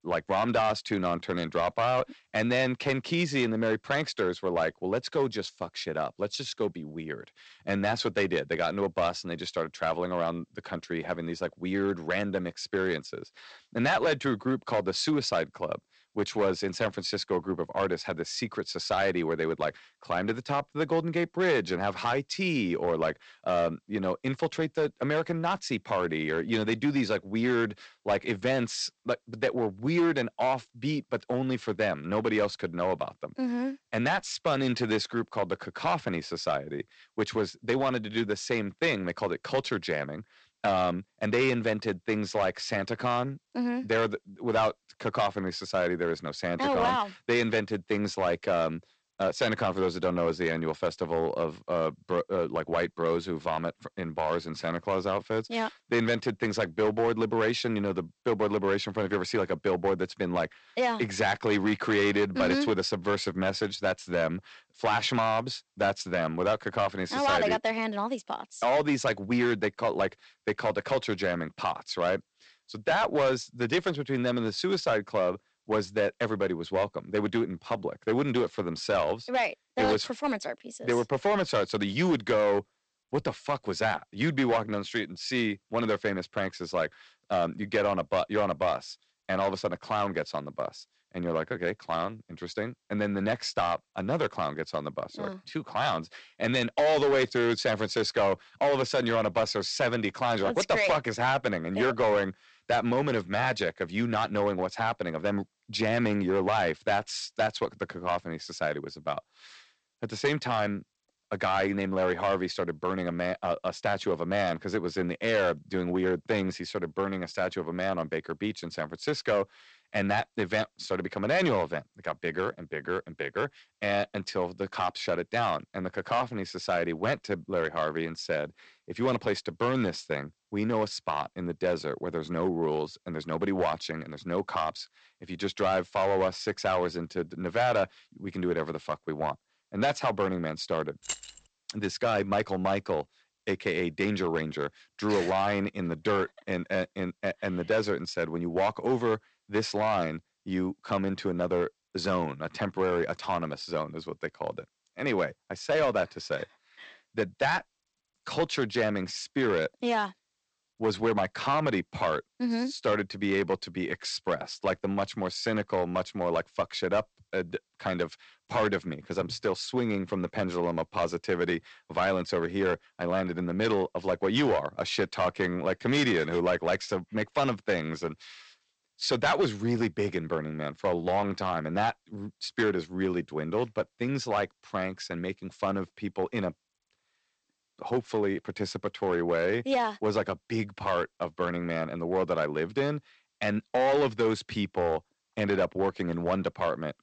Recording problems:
distortion; slight; 5% of the sound clipped
garbled, watery; slightly; nothing above 8 kHz
jangling keys; noticeable; at 2:21; peak 6 dB below the speech

